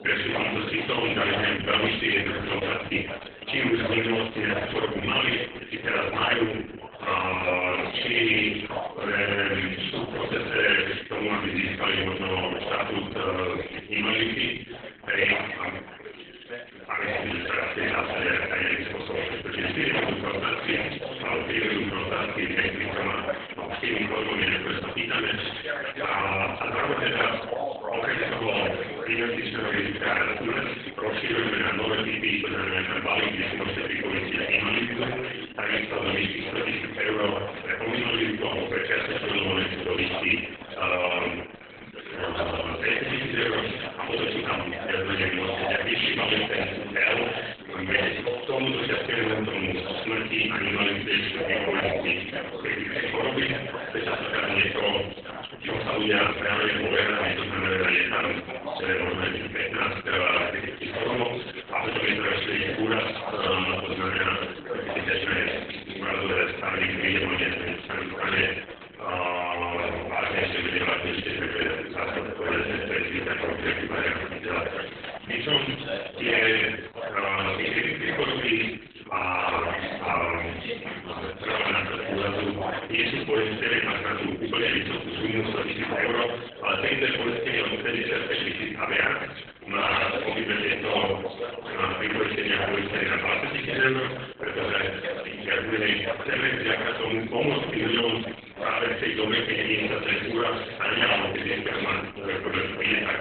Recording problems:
off-mic speech; far
garbled, watery; badly
room echo; noticeable; dies away in 0.7 s
thin; very slightly; fading below 300 Hz
background chatter; loud; throughout; 4 voices, 10 dB below the speech
uneven, jittery; strongly; from 17 s to 1:38

